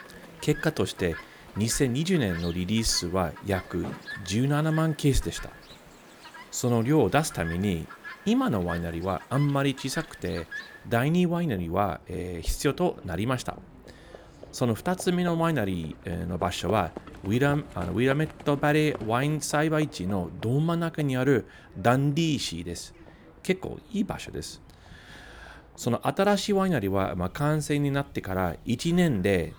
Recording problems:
animal sounds; noticeable; throughout; 20 dB below the speech

